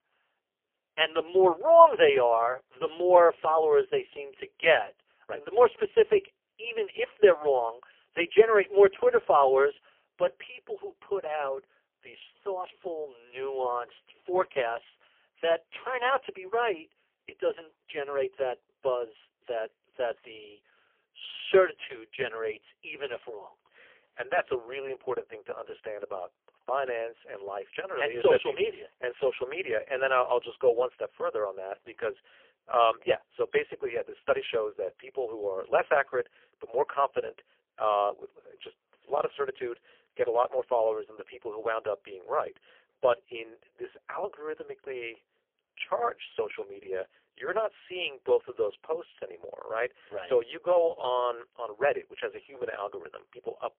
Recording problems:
phone-call audio; poor line; nothing above 3 kHz

